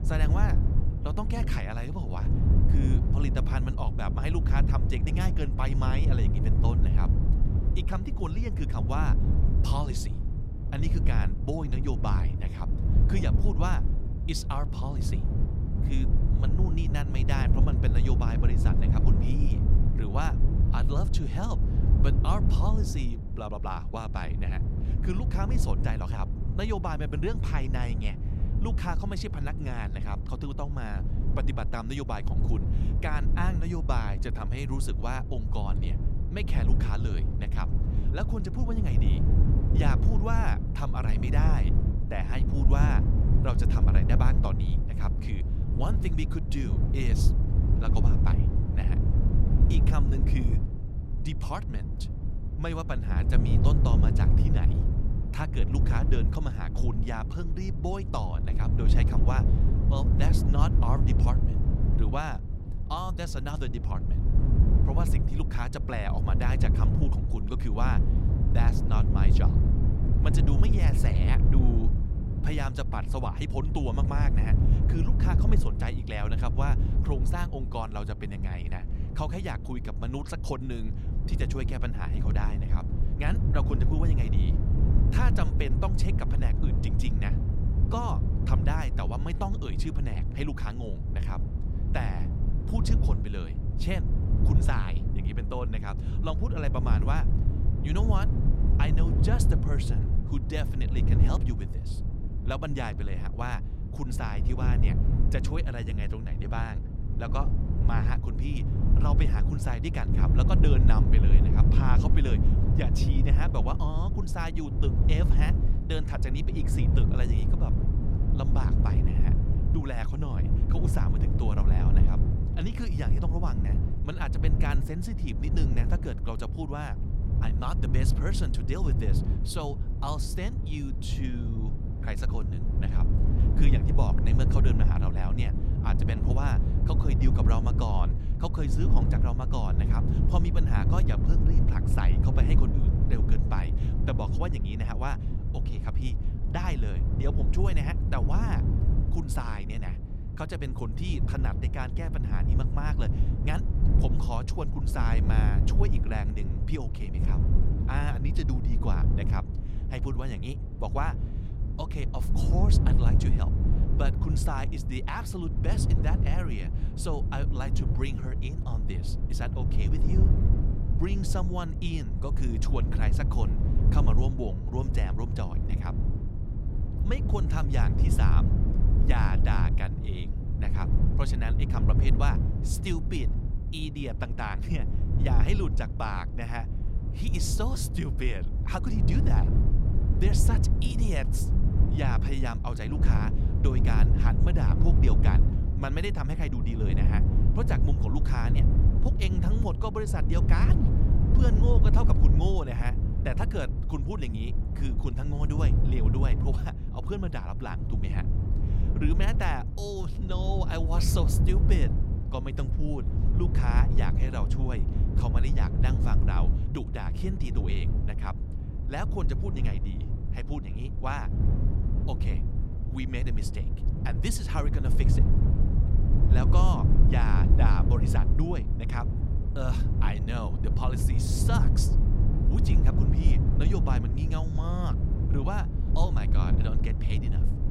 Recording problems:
low rumble; loud; throughout; 3 dB below the speech

